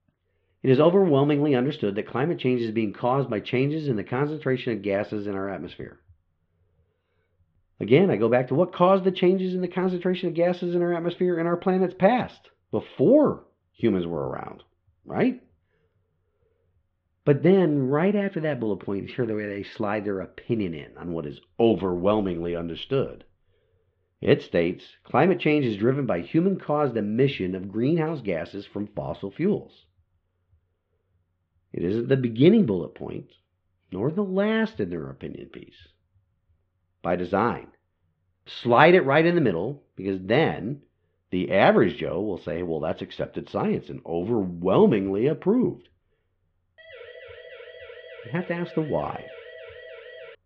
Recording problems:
muffled; very; fading above 3.5 kHz
siren; faint; from 47 s on; peak 20 dB below the speech

